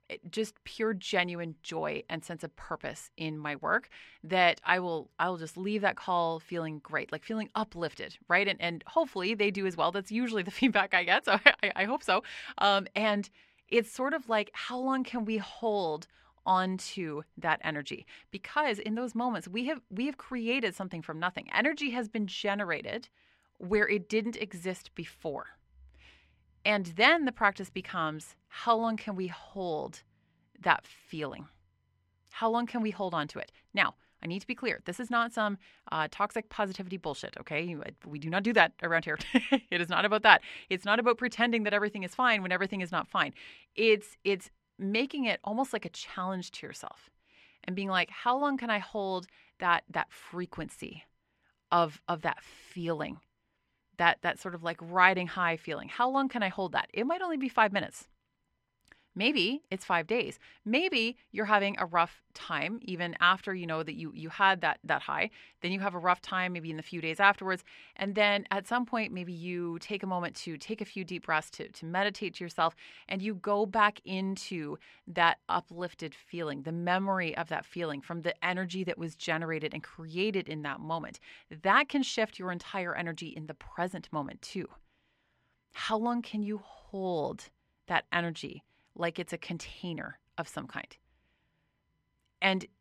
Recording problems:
muffled; very; fading above 2 kHz

